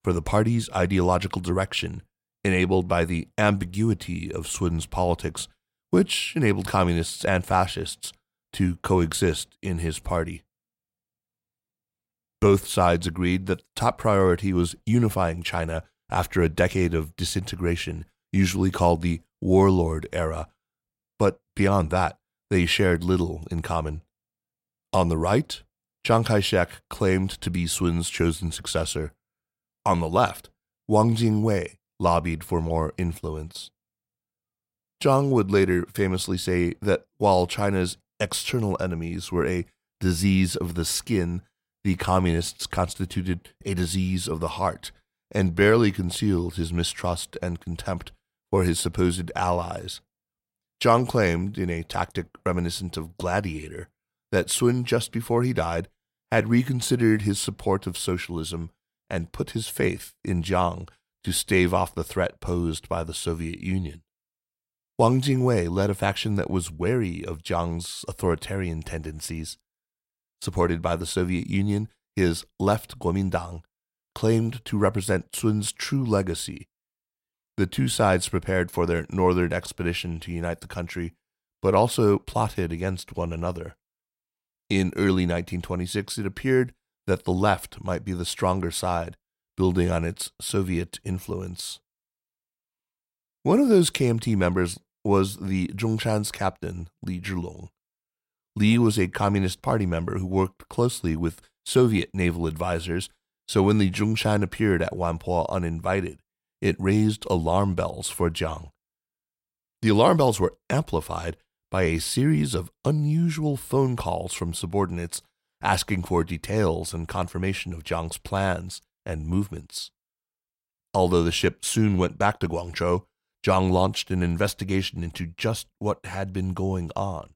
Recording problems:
none

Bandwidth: 16 kHz